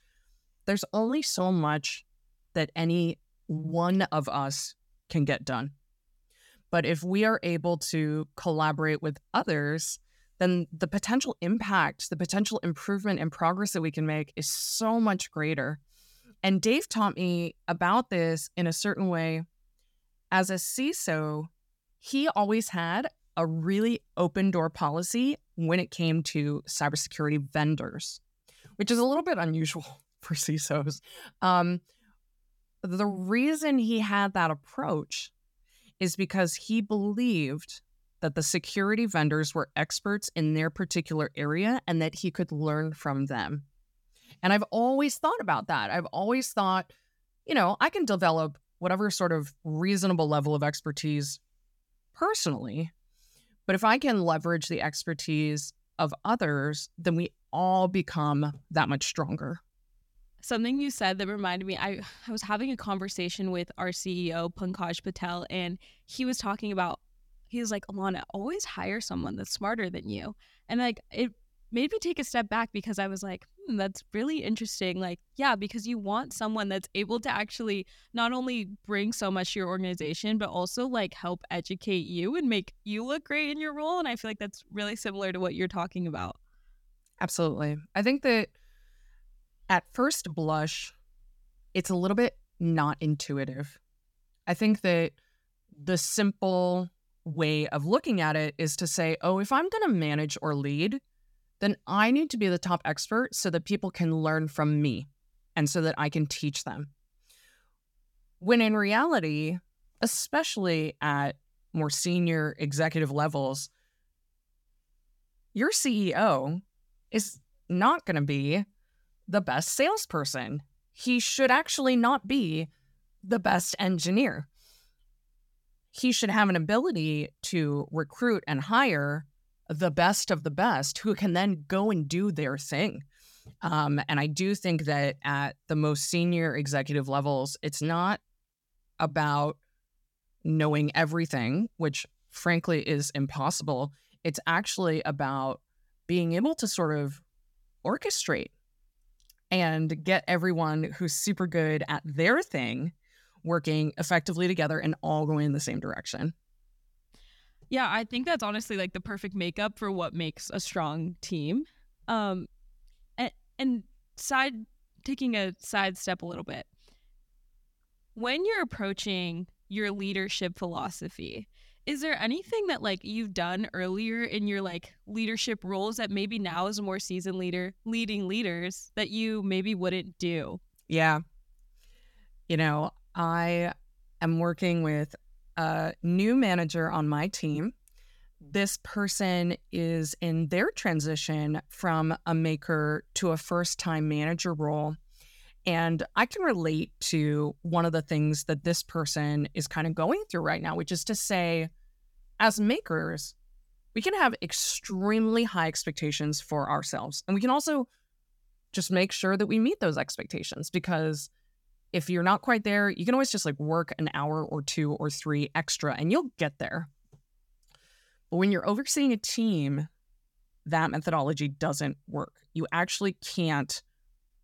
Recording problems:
none

